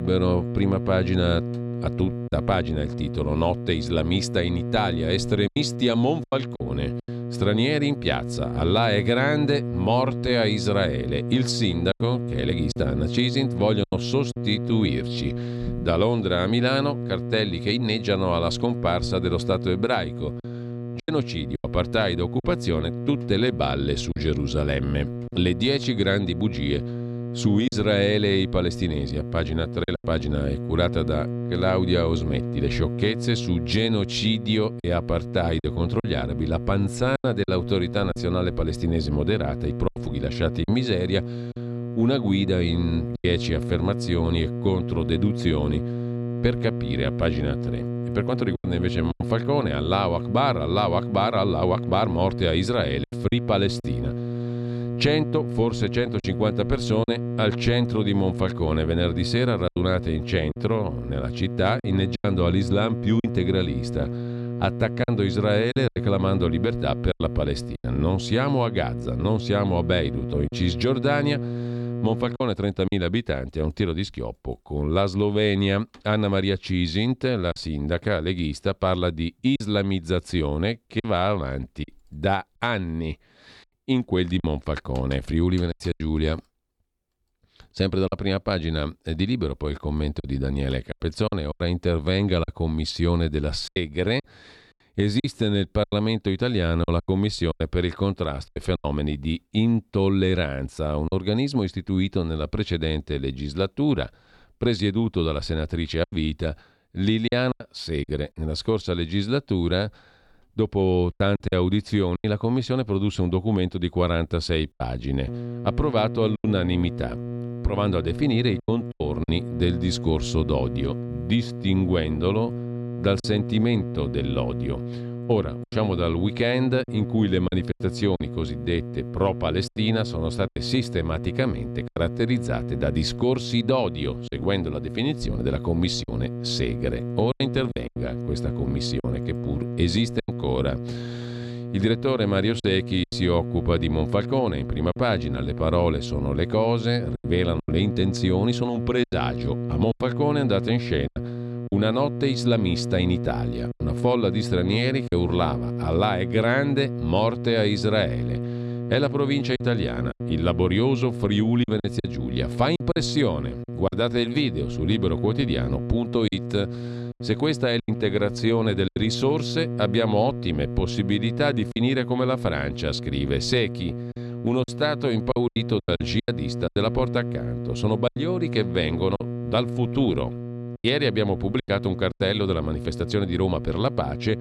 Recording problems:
electrical hum; noticeable; until 1:12 and from 1:55 on; 60 Hz, 10 dB below the speech
choppy; occasionally; 4% of the speech affected
abrupt cut into speech; at the start

